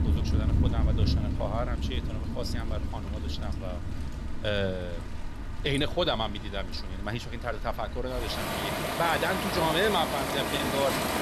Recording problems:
rain or running water; very loud; throughout; as loud as the speech

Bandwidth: 13.5 kHz